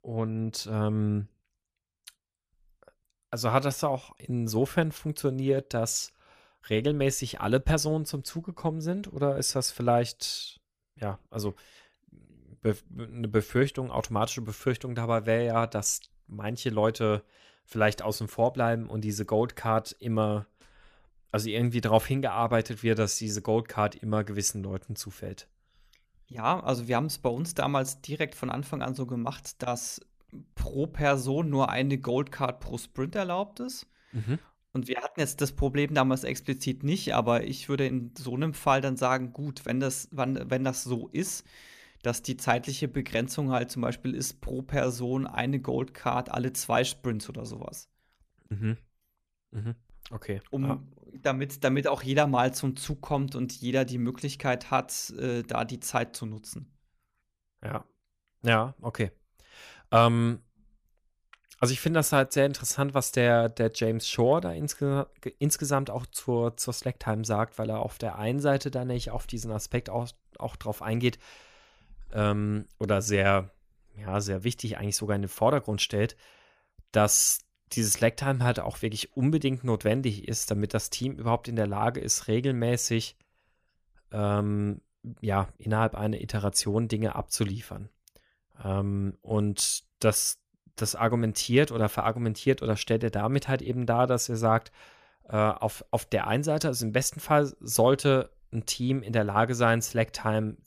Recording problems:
none

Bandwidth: 14.5 kHz